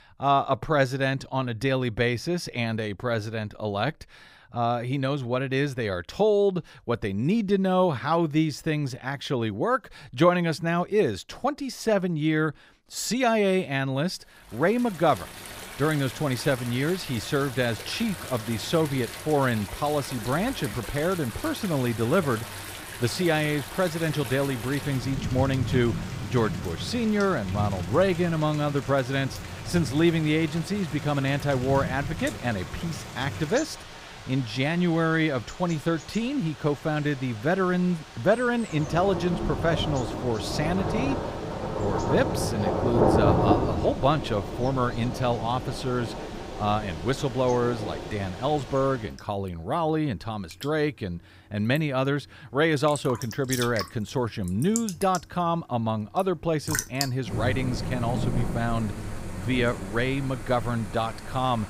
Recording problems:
rain or running water; loud; from 15 s on; 7 dB below the speech

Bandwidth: 15.5 kHz